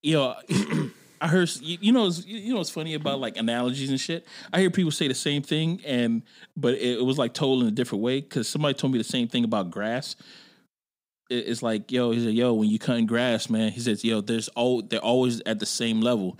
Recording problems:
none

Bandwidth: 15.5 kHz